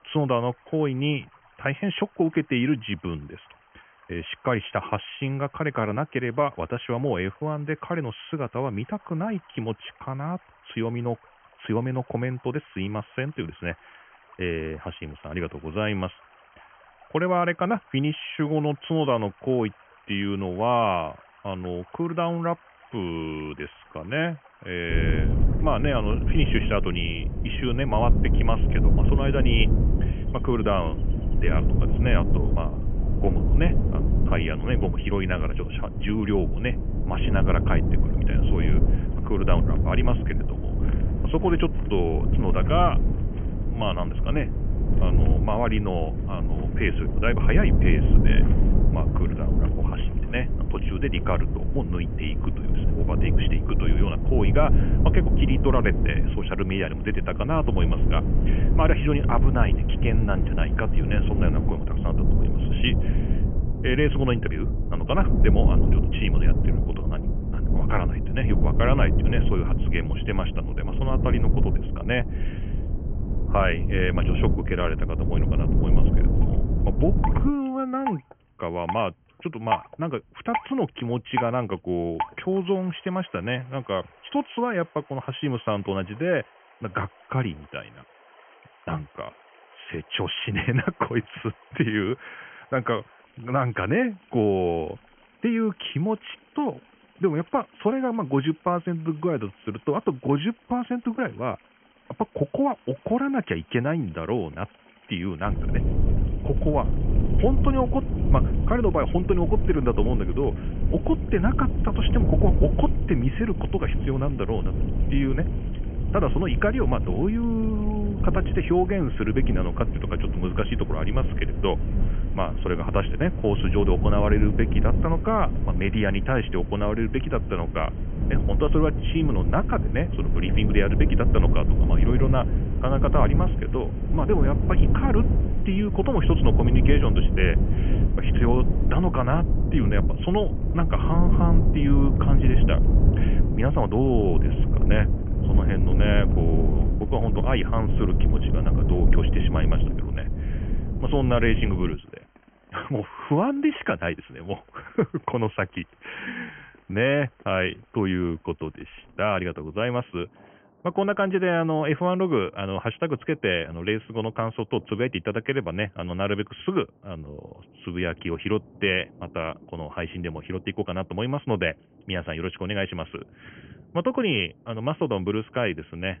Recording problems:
high frequencies cut off; severe; nothing above 3 kHz
low rumble; loud; from 25 s to 1:18 and from 1:45 to 2:32; 8 dB below the speech
rain or running water; noticeable; throughout; 20 dB below the speech

